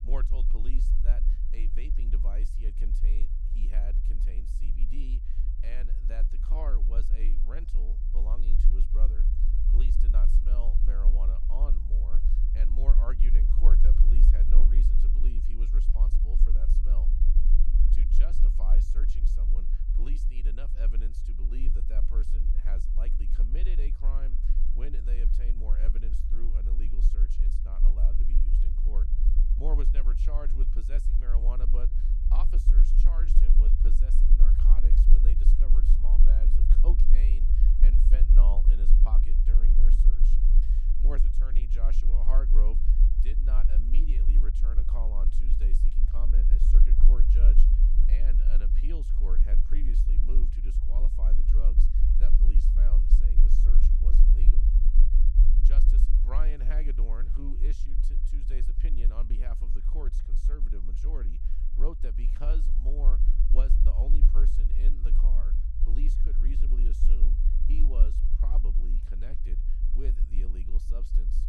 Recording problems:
low rumble; loud; throughout; 3 dB below the speech

